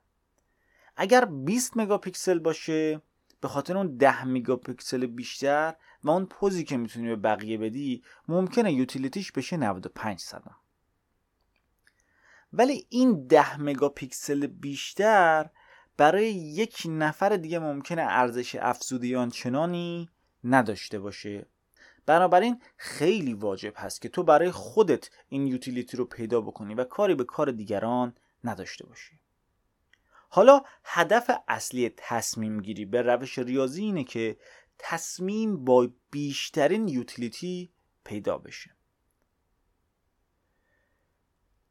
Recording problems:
none

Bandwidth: 17 kHz